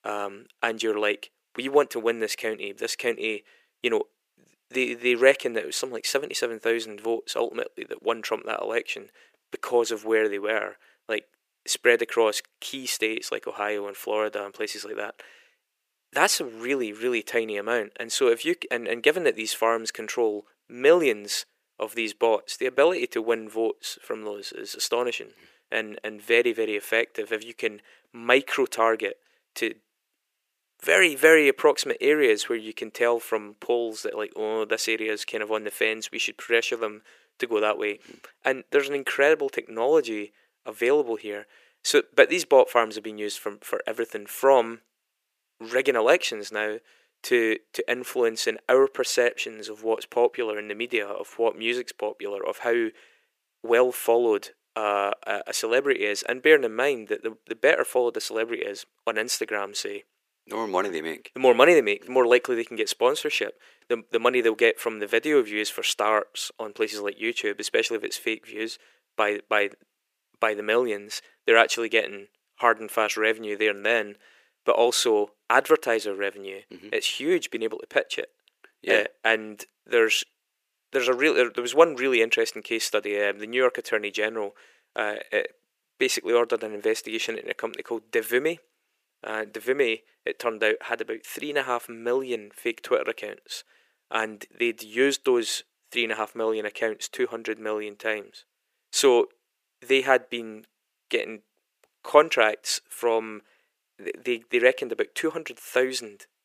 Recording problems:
thin; very; fading below 400 Hz

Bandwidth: 15 kHz